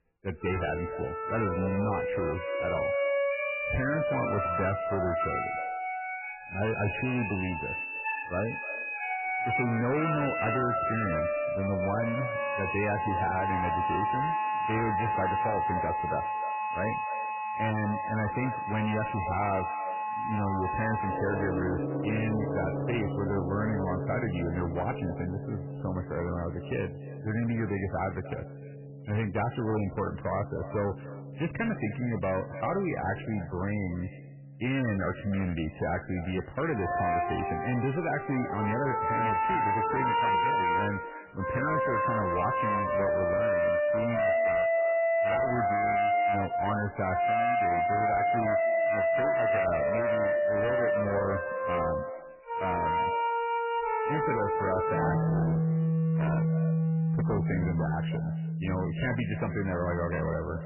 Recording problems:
distortion; heavy; 23% of the sound clipped
garbled, watery; badly; nothing above 3 kHz
echo of what is said; noticeable; throughout; 300 ms later, 15 dB below the speech
background music; very loud; throughout; 3 dB above the speech

